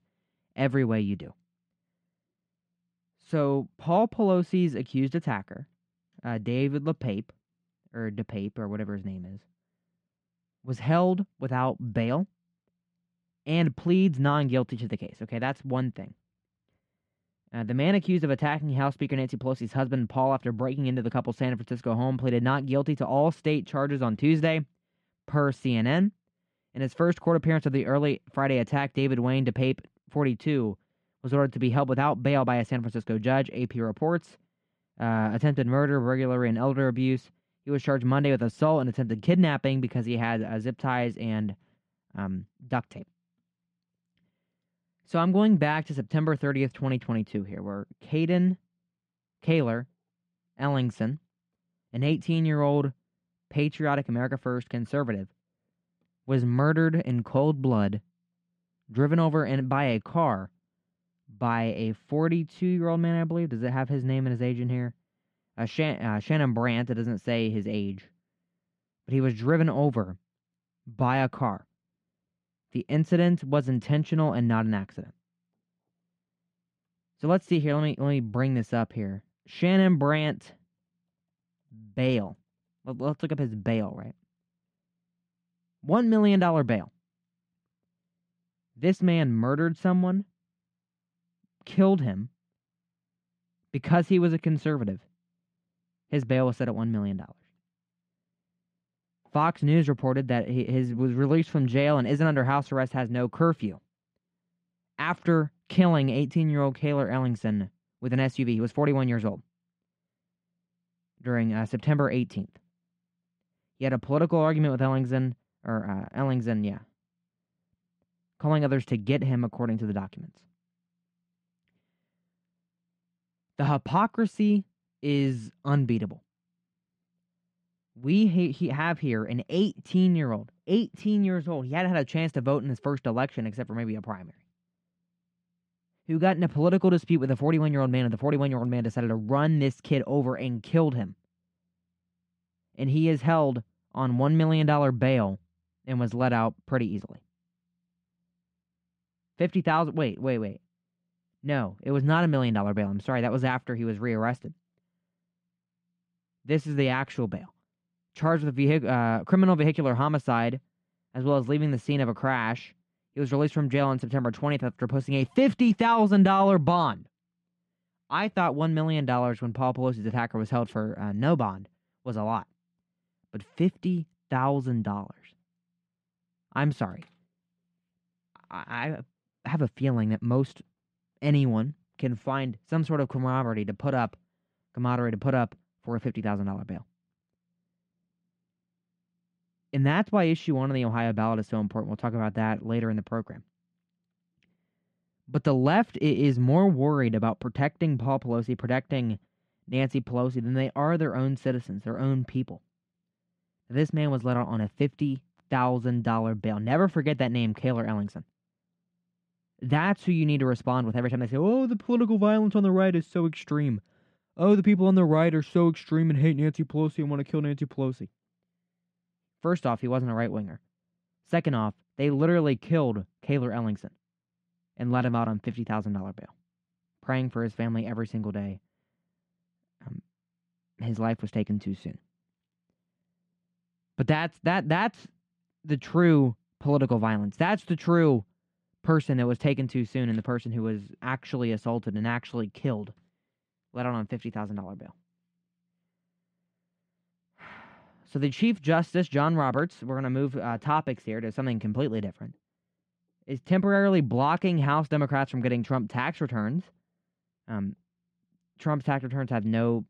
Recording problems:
muffled; slightly; fading above 3.5 kHz

